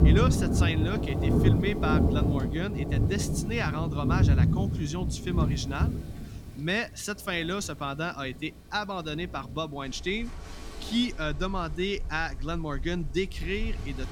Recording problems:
rain or running water; very loud; throughout; 5 dB above the speech

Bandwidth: 17 kHz